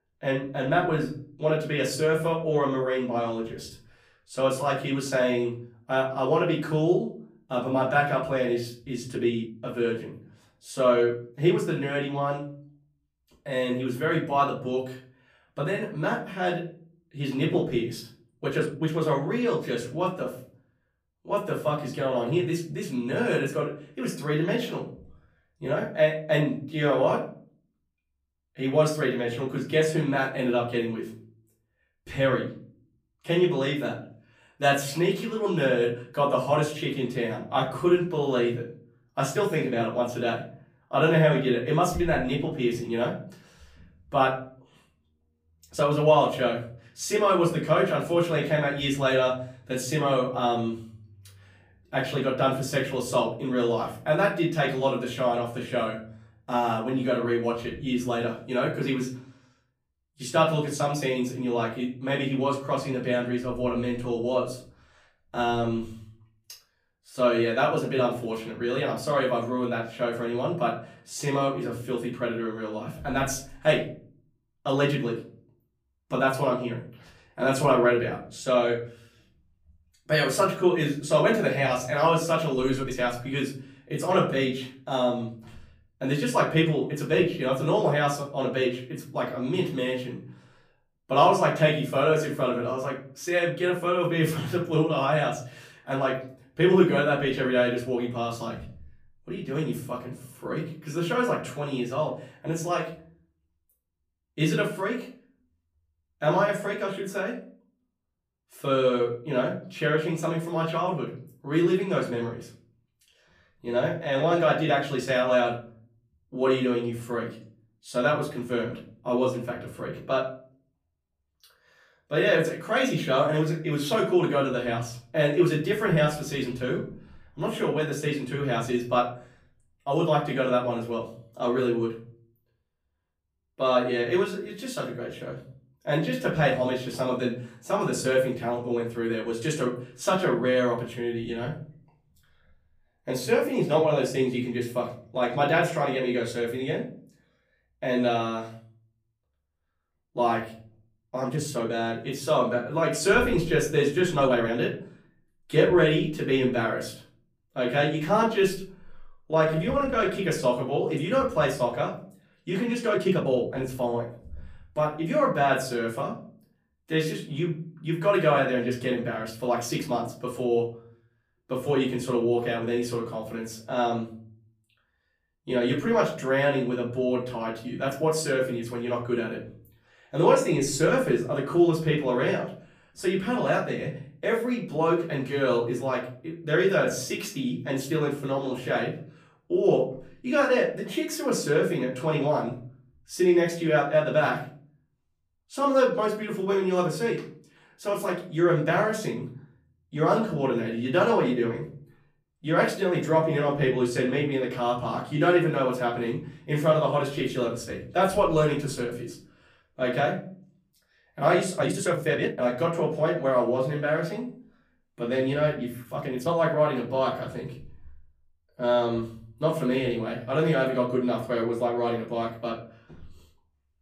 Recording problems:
off-mic speech; far
room echo; slight; dies away in 0.5 s
uneven, jittery; strongly; from 9 s to 3:36

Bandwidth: 15 kHz